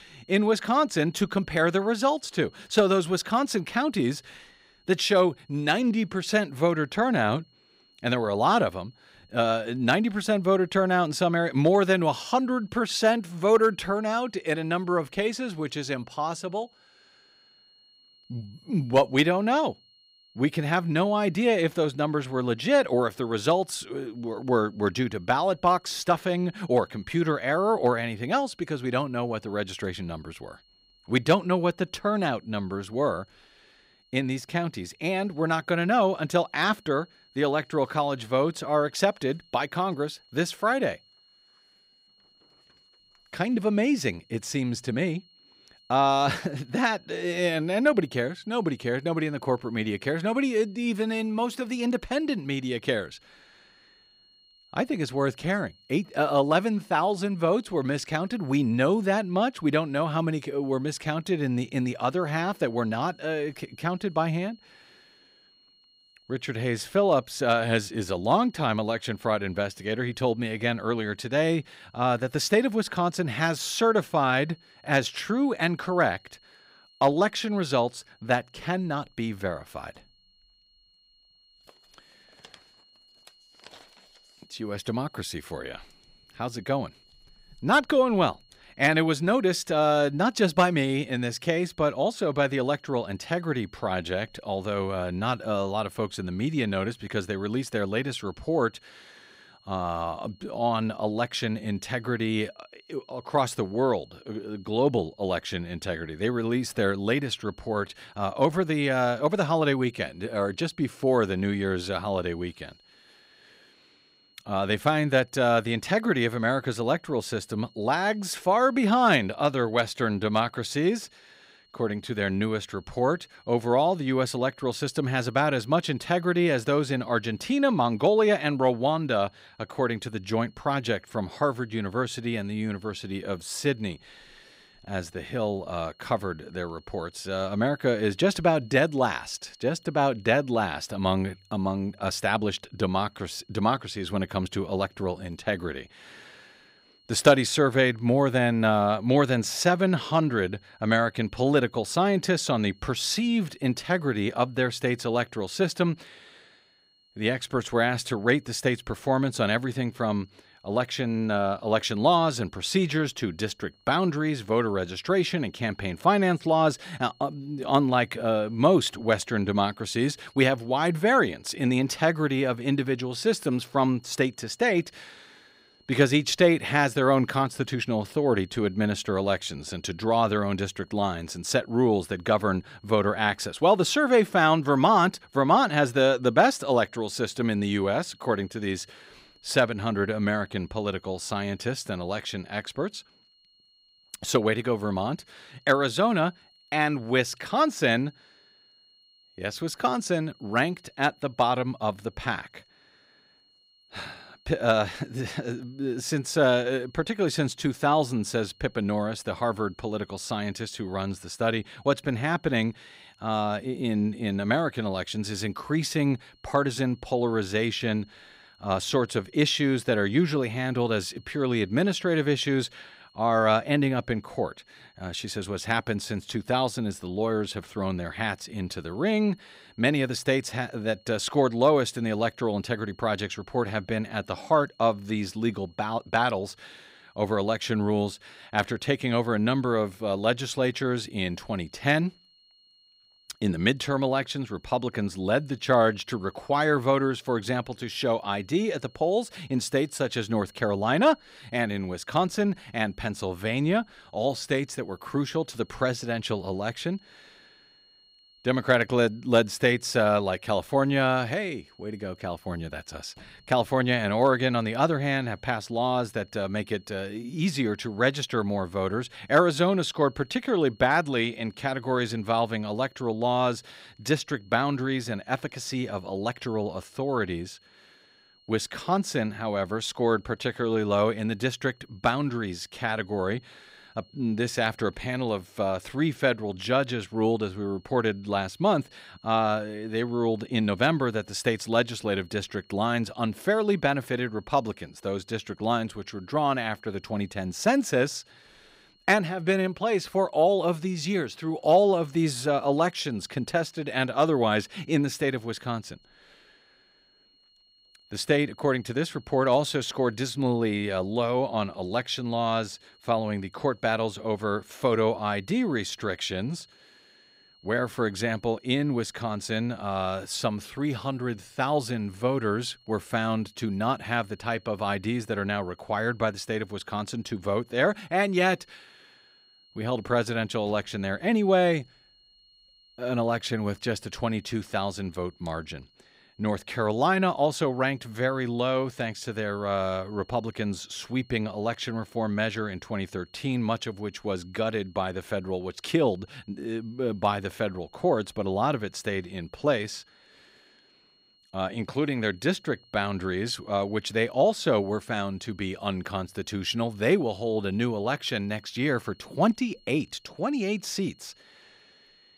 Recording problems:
high-pitched whine; faint; throughout; 4.5 kHz, 30 dB below the speech

